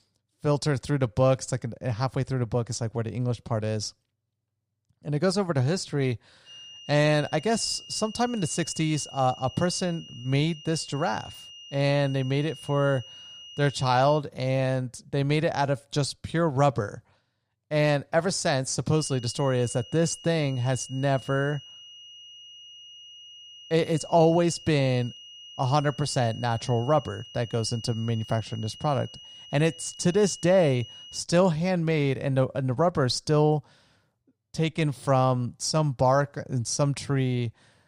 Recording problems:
high-pitched whine; noticeable; from 6.5 to 14 s and from 19 to 31 s; 3 kHz, 15 dB below the speech

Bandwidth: 15.5 kHz